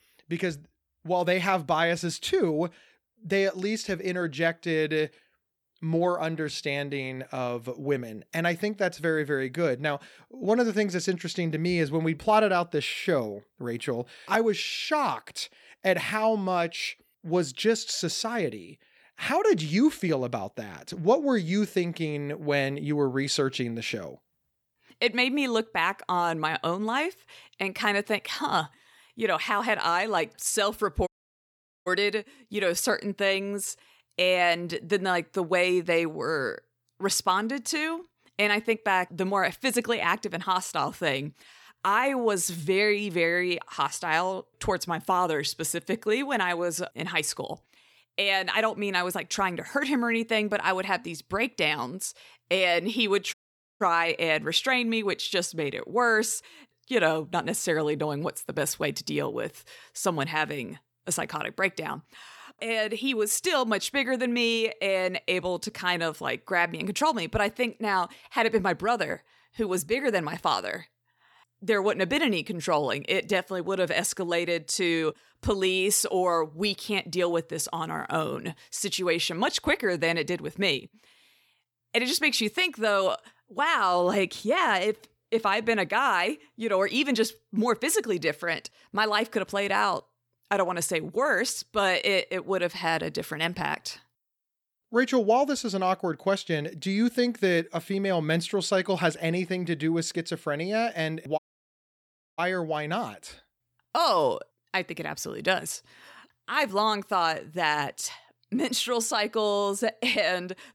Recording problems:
audio cutting out; at 31 s for 1 s, at 53 s and at 1:41 for 1 s

